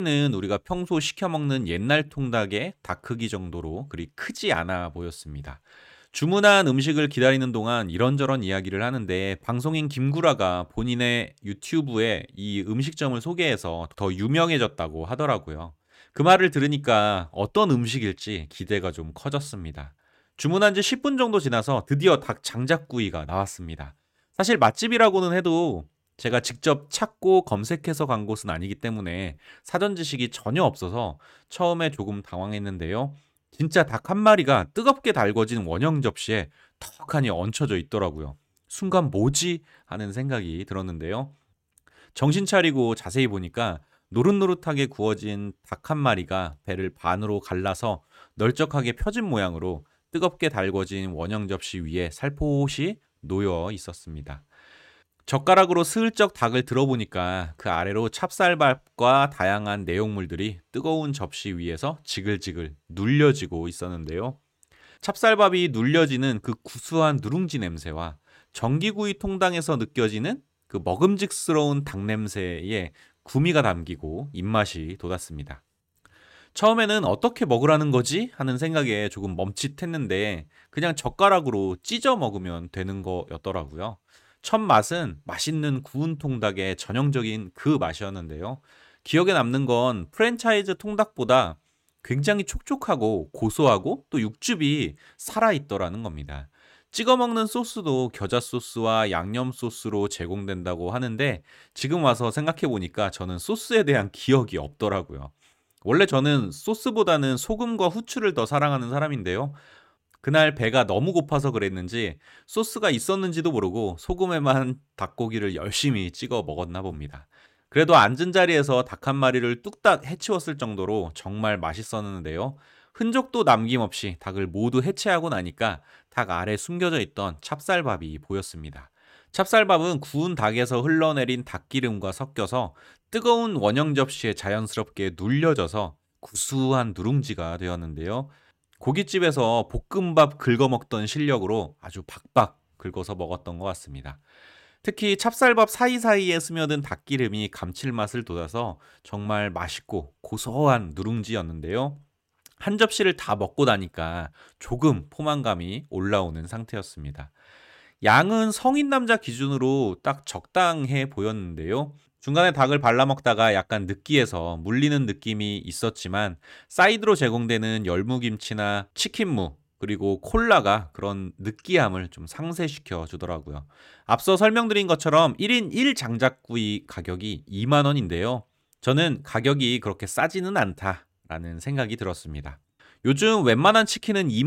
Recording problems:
abrupt cut into speech; at the start and the end

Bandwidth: 16 kHz